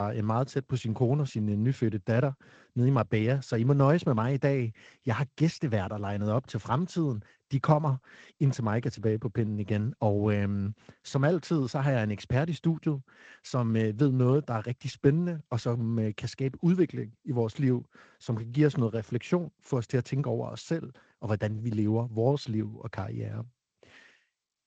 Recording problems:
garbled, watery; slightly; nothing above 7.5 kHz
abrupt cut into speech; at the start

